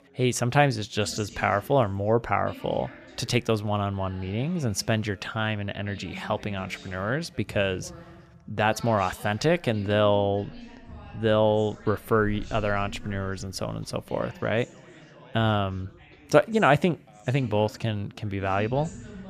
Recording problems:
background chatter; noticeable; throughout; 3 voices, 20 dB below the speech

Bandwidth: 14.5 kHz